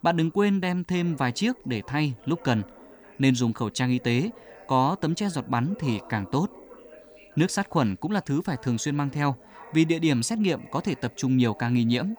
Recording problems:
background chatter; faint; throughout; 2 voices, 25 dB below the speech

